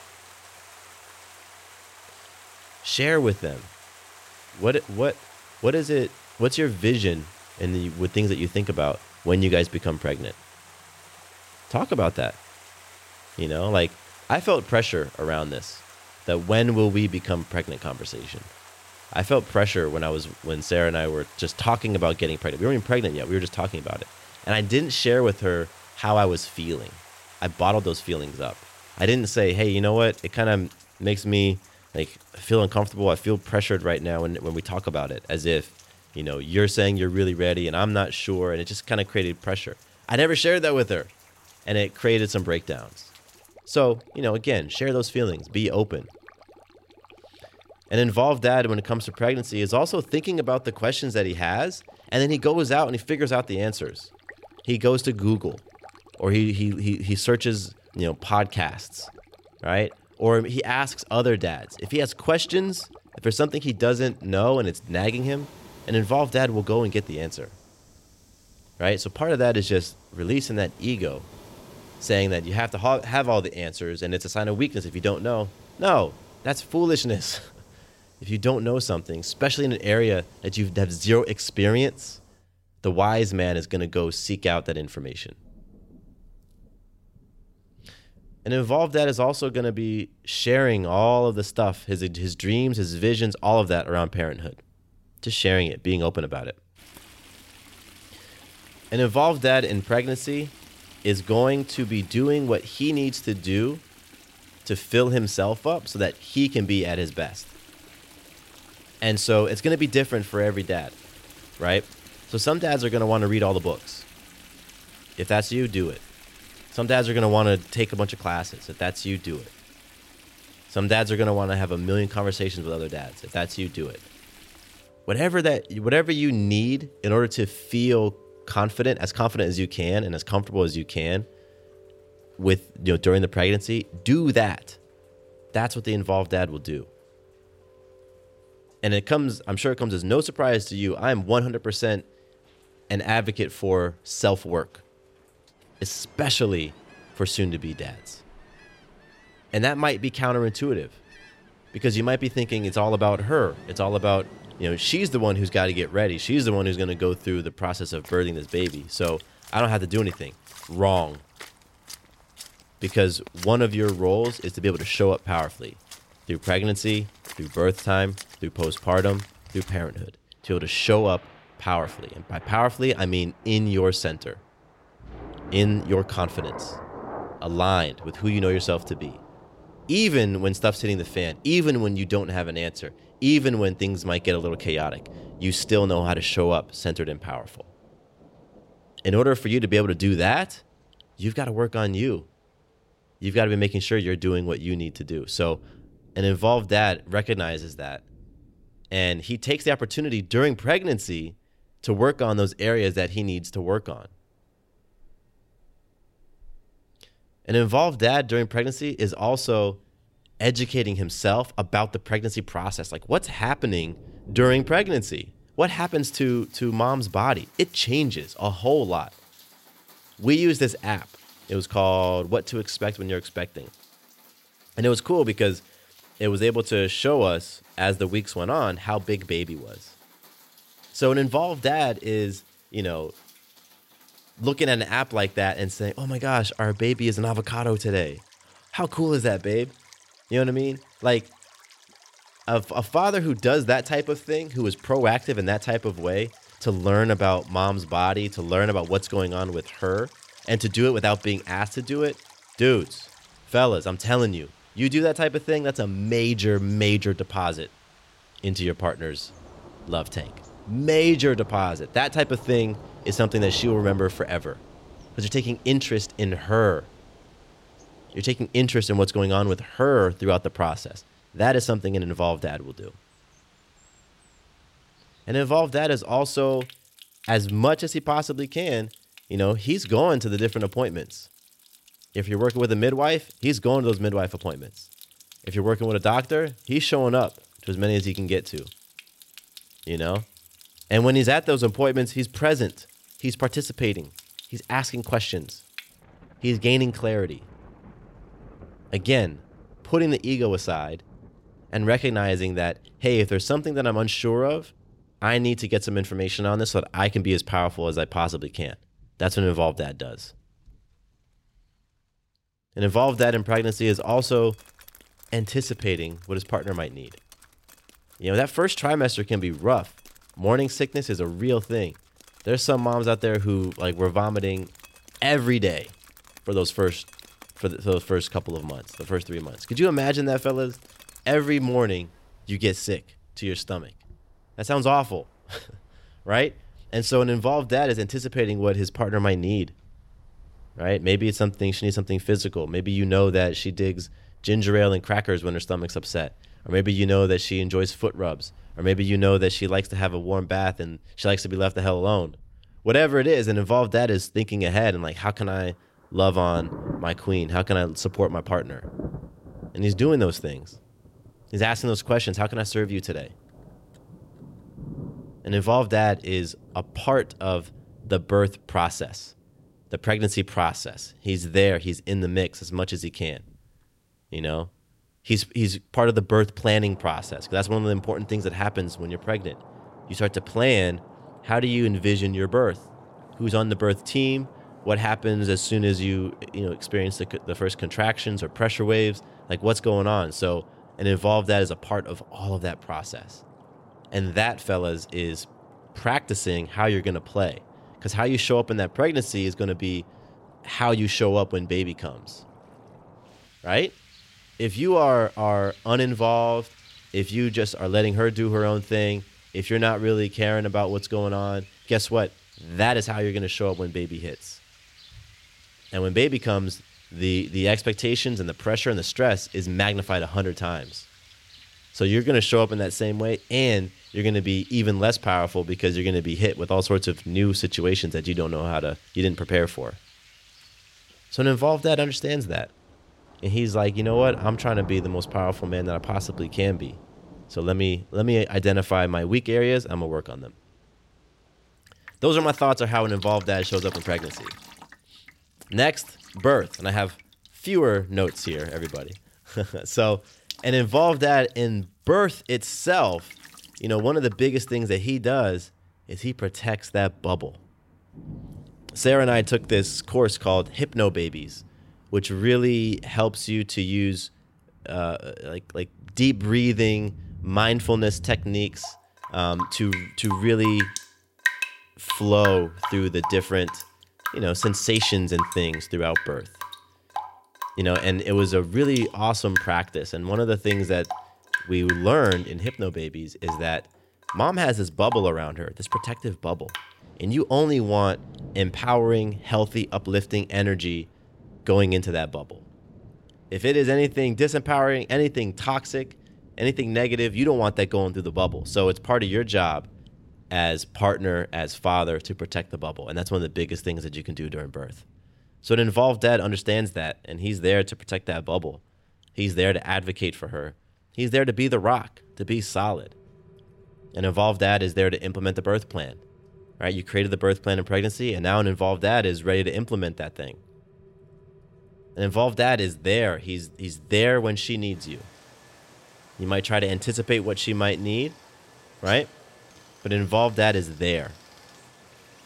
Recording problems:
rain or running water; noticeable; throughout; 20 dB below the speech

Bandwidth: 16 kHz